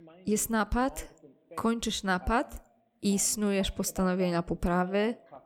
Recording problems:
voice in the background; faint; throughout; 20 dB below the speech

